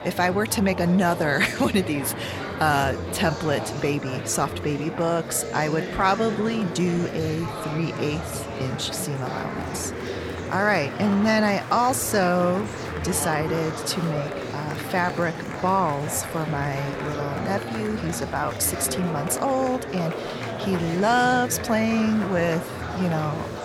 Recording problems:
murmuring crowd; loud; throughout; 7 dB below the speech

